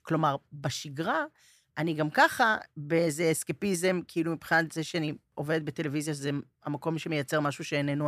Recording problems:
abrupt cut into speech; at the end

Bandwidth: 14.5 kHz